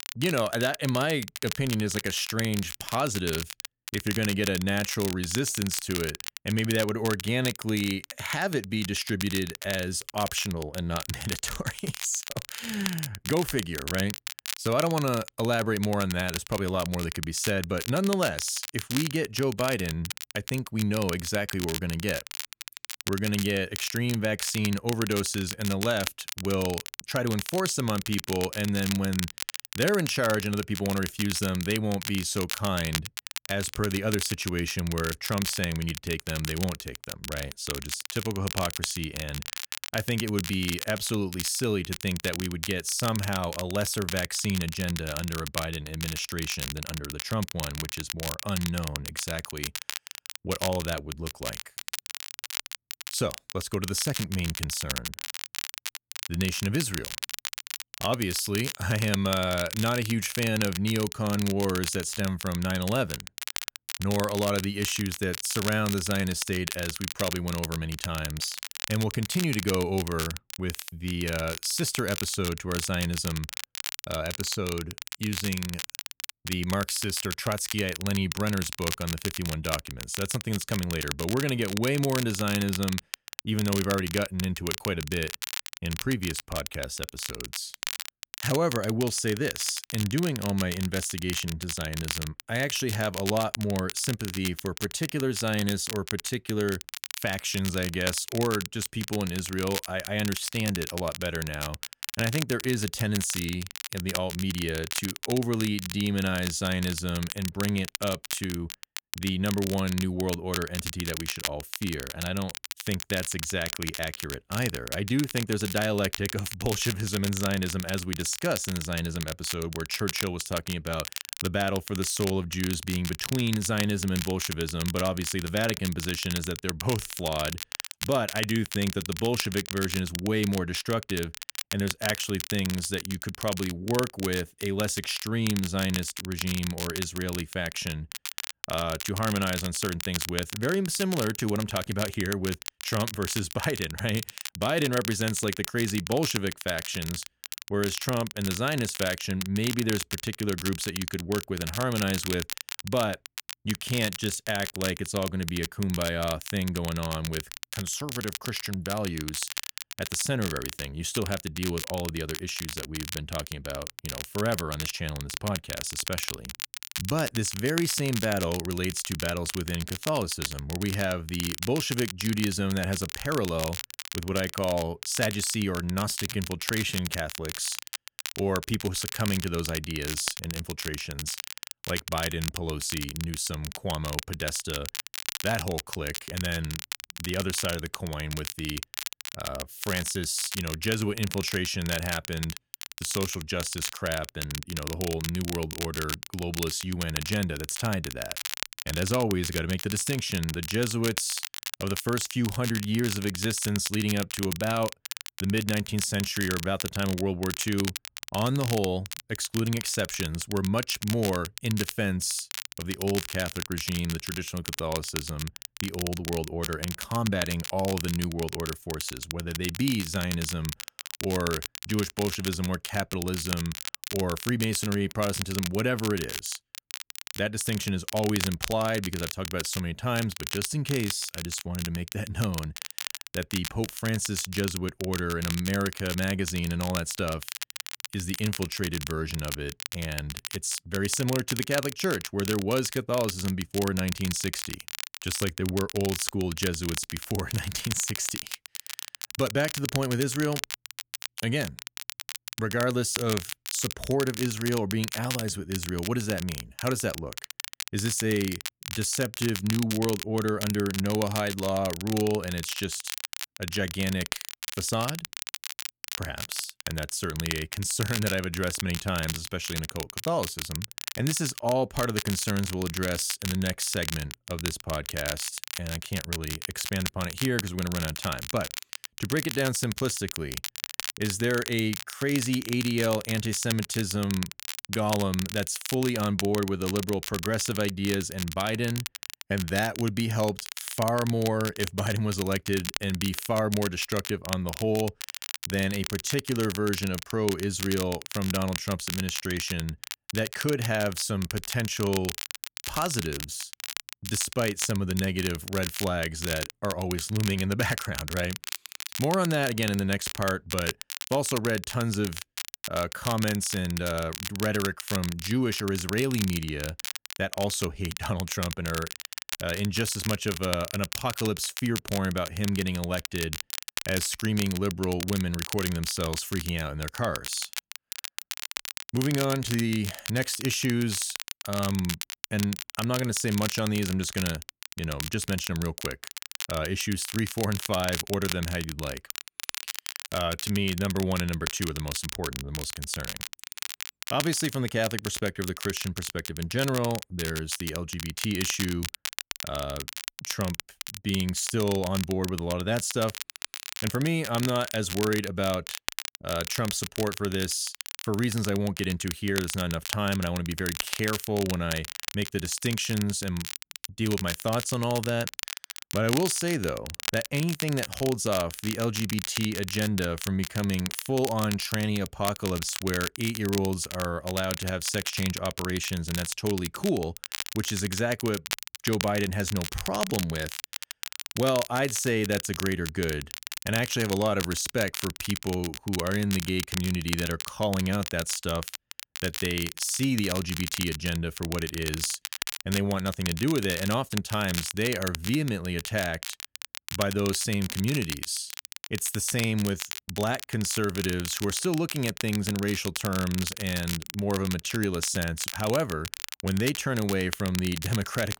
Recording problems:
crackle, like an old record; loud; 6 dB below the speech

